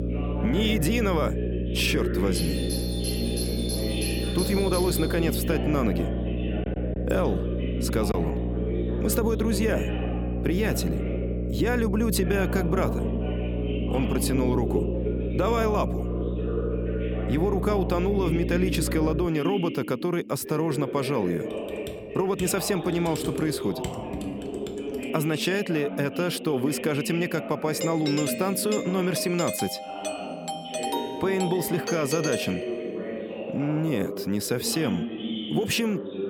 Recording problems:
electrical hum; loud; until 19 s; 60 Hz, 8 dB below the speech
voice in the background; loud; throughout; 7 dB below the speech
doorbell; noticeable; from 2.5 to 5.5 s and from 28 to 33 s; peak 3 dB below the speech
choppy; occasionally; at 8 s; 1% of the speech affected
keyboard typing; faint; from 22 to 25 s; peak 10 dB below the speech

